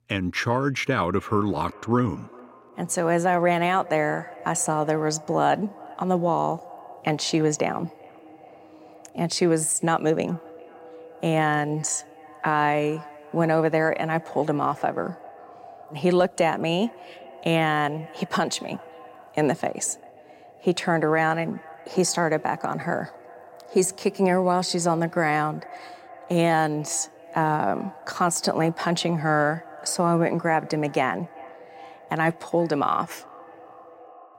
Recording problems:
echo of what is said; faint; throughout; 400 ms later, 20 dB below the speech

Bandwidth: 16 kHz